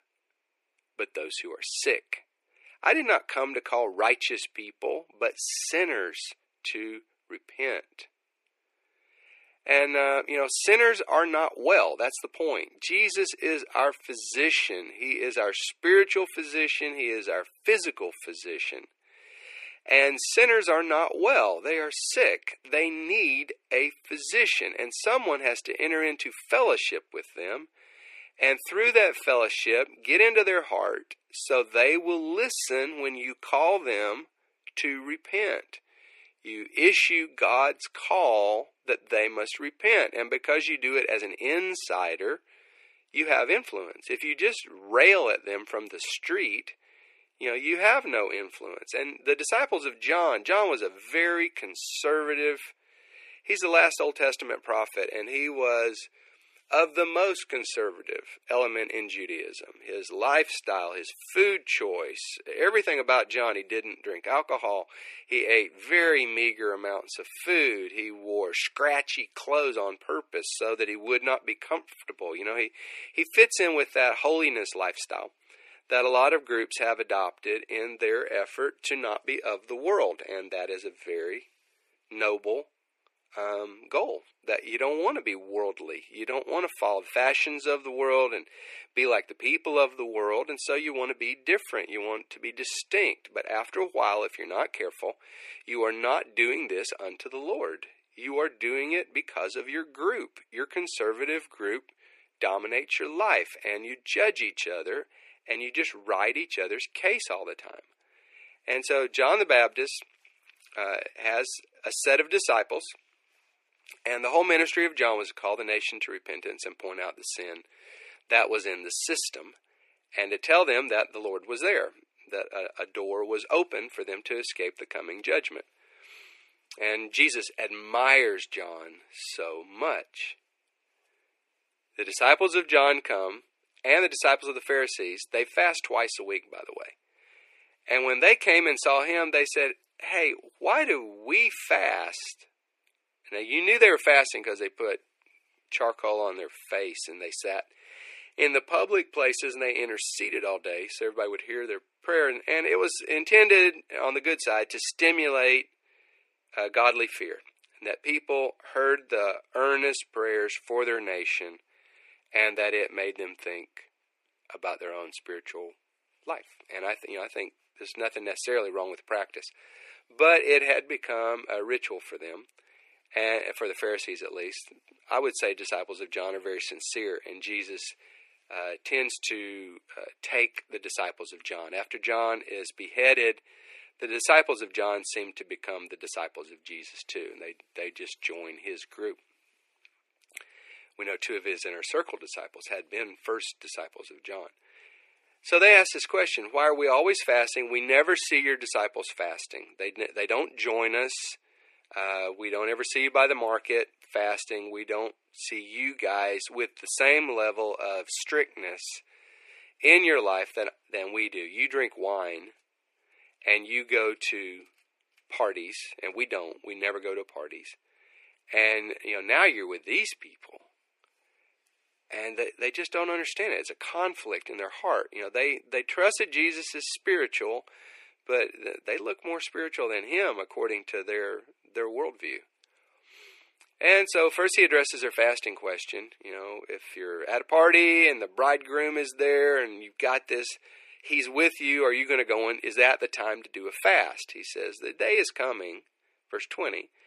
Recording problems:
thin; very; fading below 350 Hz

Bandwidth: 14 kHz